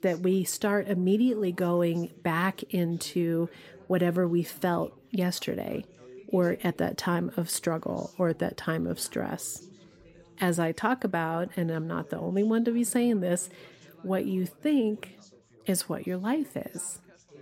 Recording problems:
background chatter; faint; throughout; 3 voices, 25 dB below the speech

